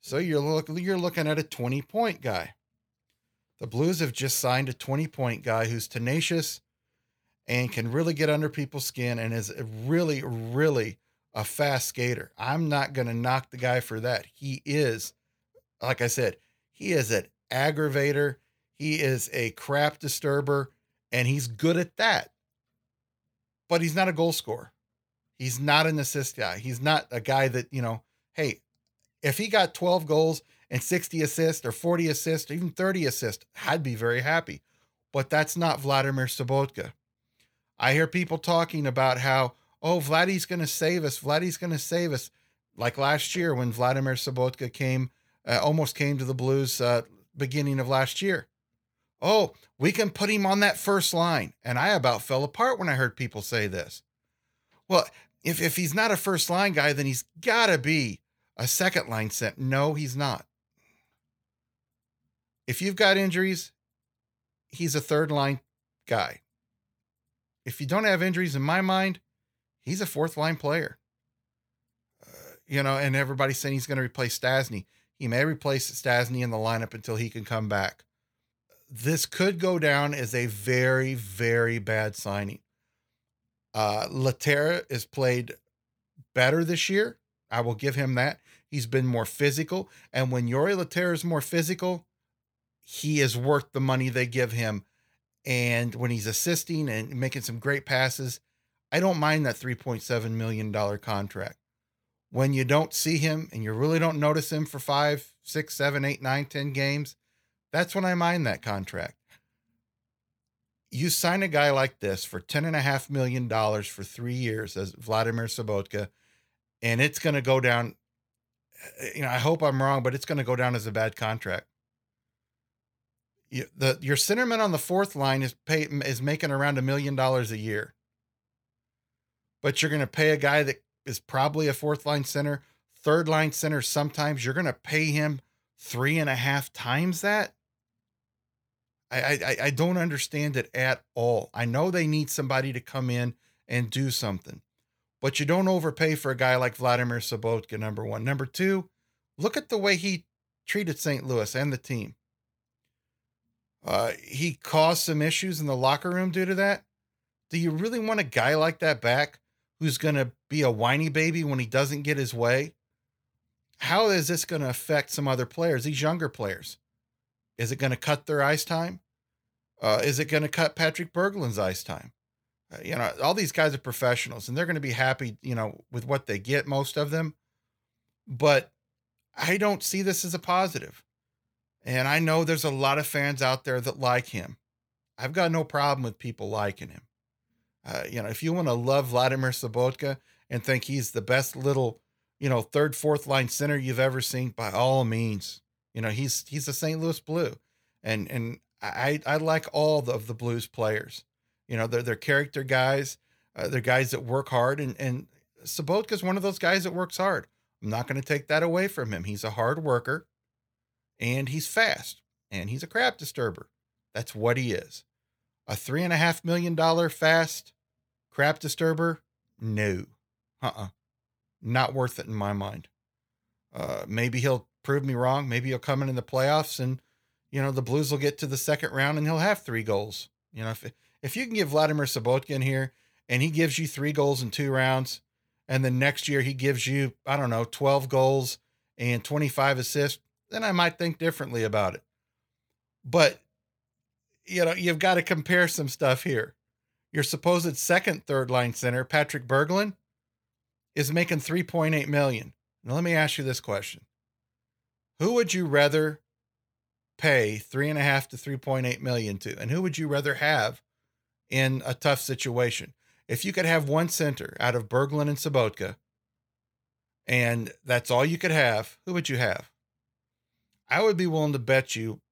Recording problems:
none

